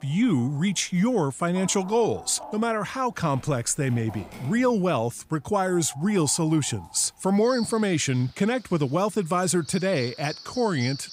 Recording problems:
animal sounds; noticeable; throughout; 15 dB below the speech

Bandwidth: 15.5 kHz